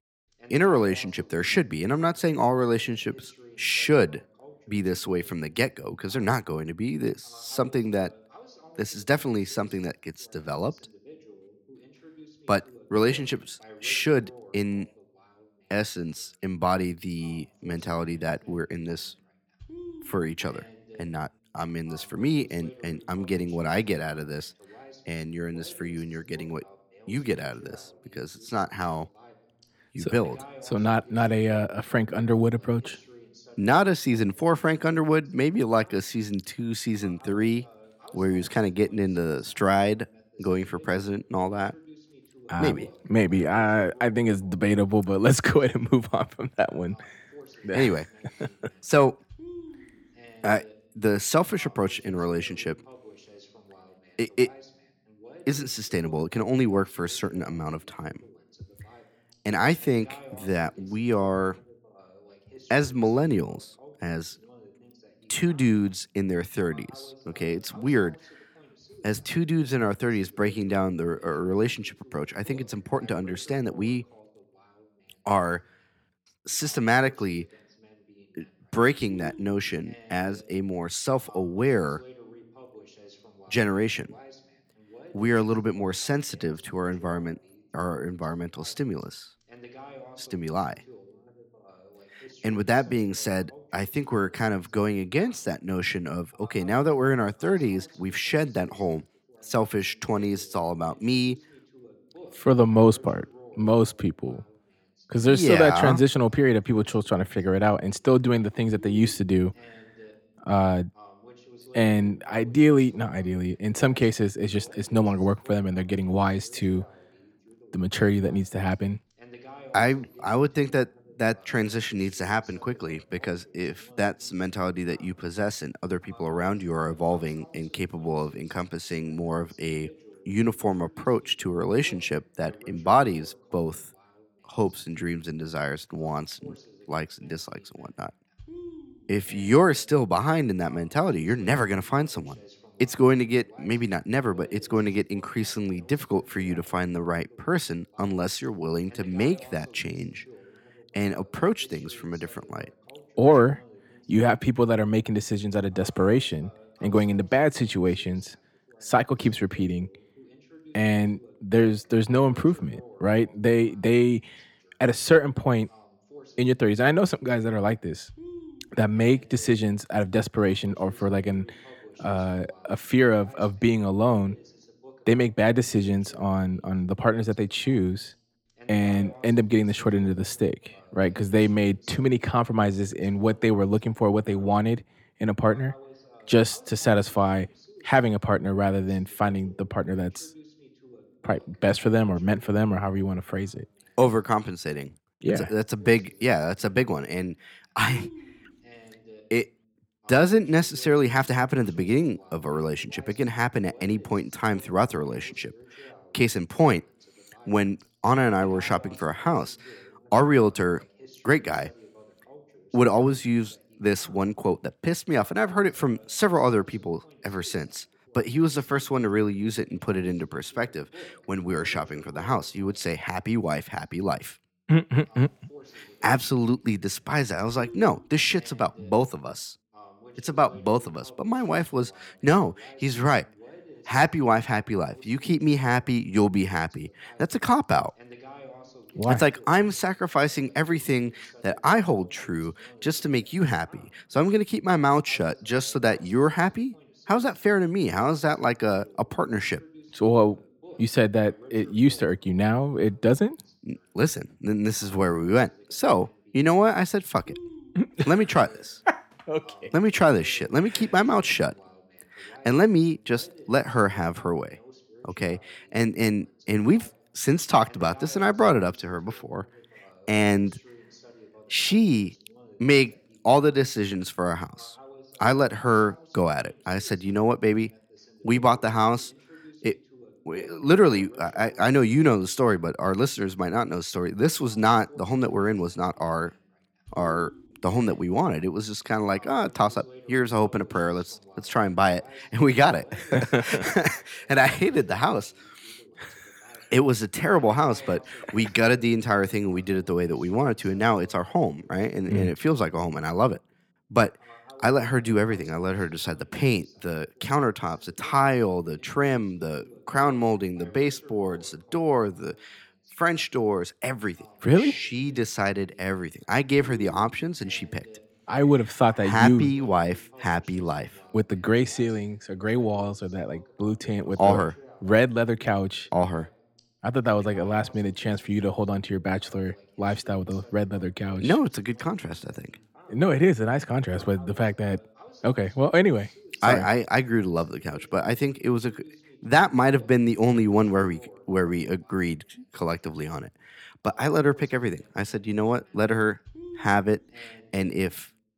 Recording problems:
voice in the background; faint; throughout; 25 dB below the speech

